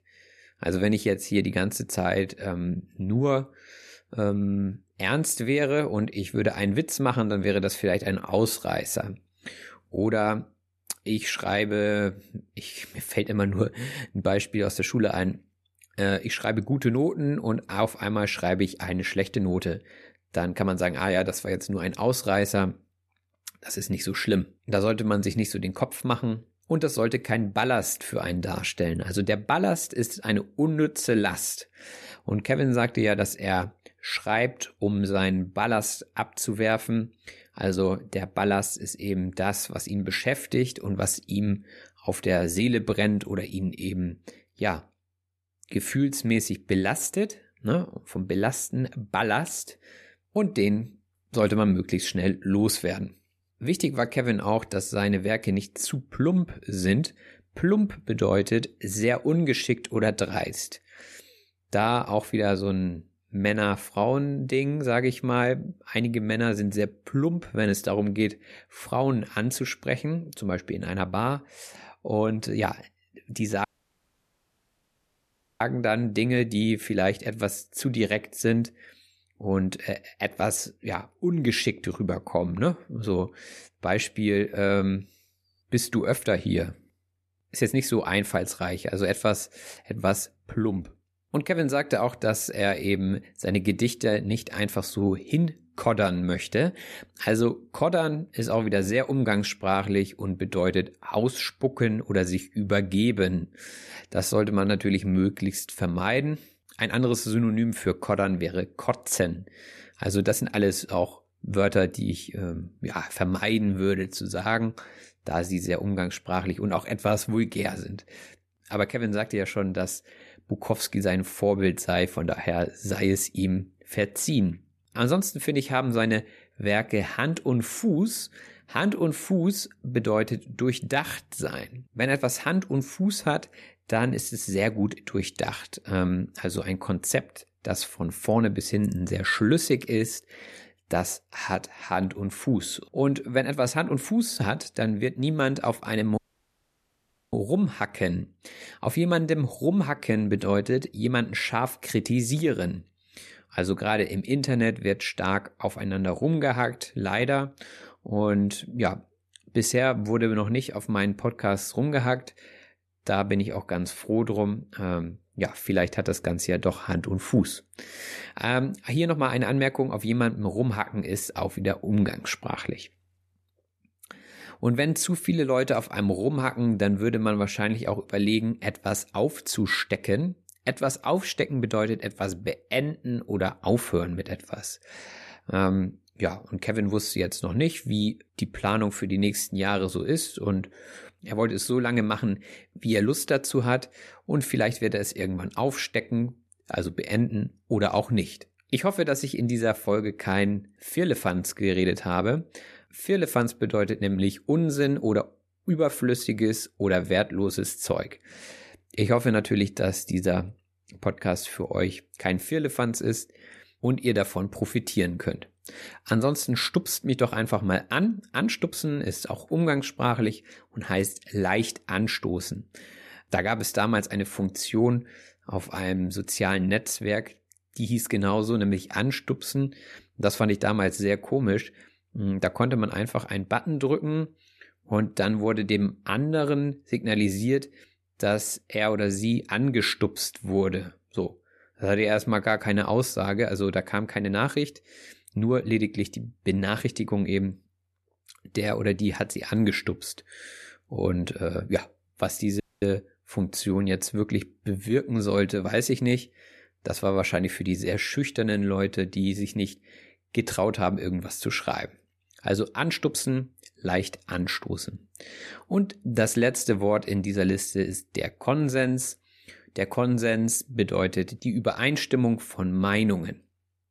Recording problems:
audio cutting out; at 1:14 for 2 s, at 2:26 for 1 s and at 4:13

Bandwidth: 13.5 kHz